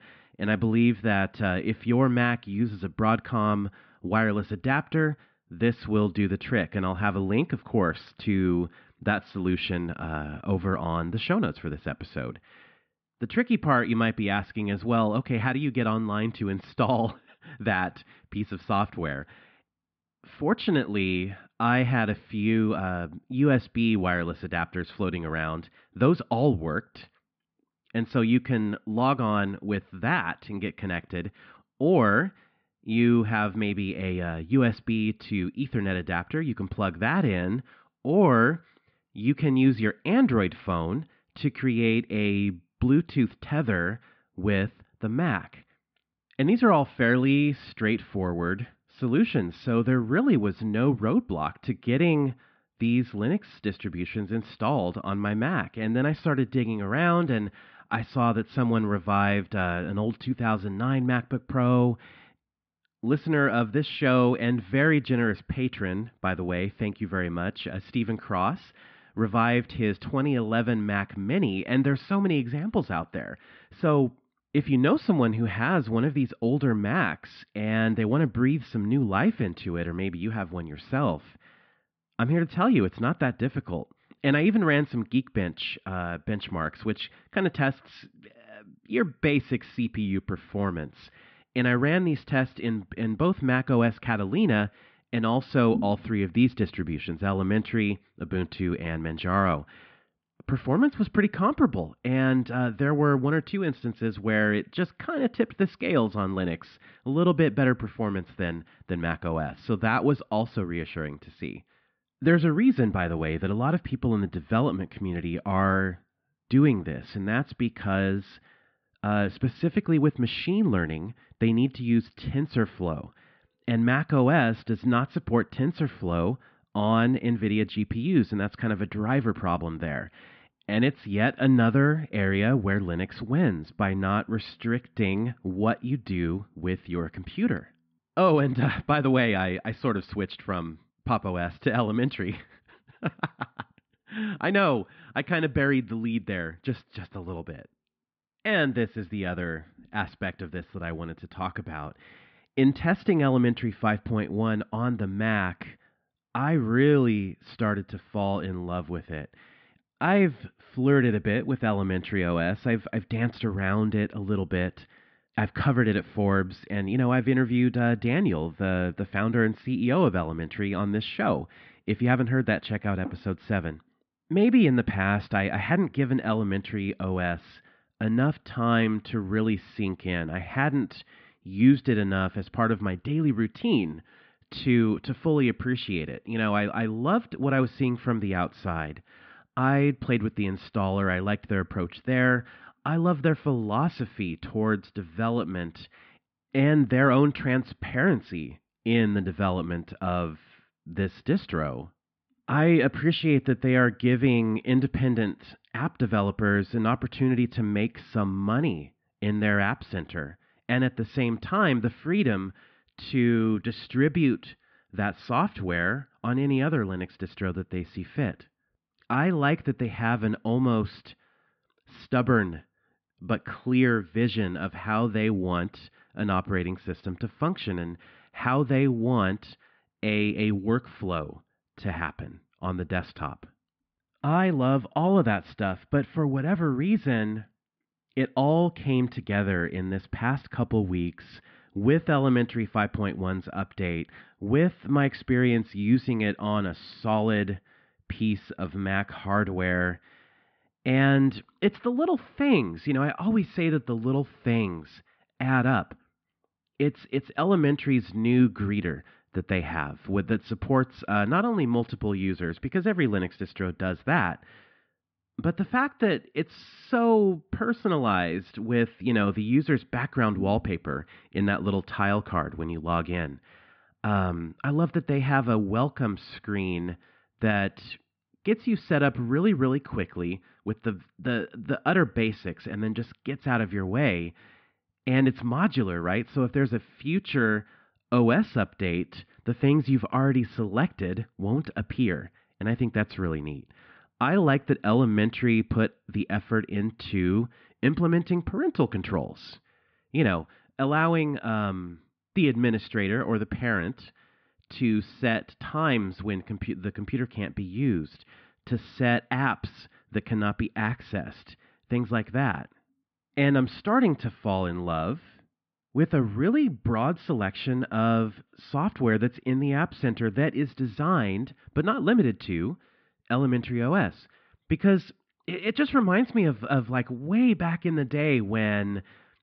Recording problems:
muffled; very; fading above 2 kHz
high frequencies cut off; noticeable; nothing above 5.5 kHz

